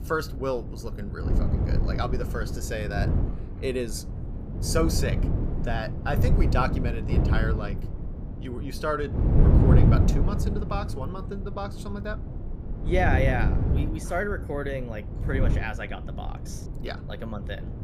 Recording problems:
wind noise on the microphone; heavy; 6 dB below the speech

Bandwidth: 15 kHz